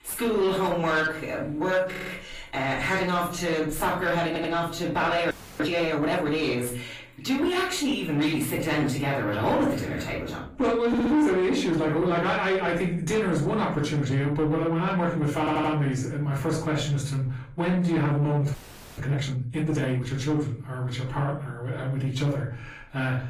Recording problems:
off-mic speech; far
room echo; slight; dies away in 0.4 s
distortion; slight; 10 dB below the speech
garbled, watery; slightly; nothing above 15 kHz
audio stuttering; 4 times, first at 2 s
audio freezing; at 5.5 s and at 19 s

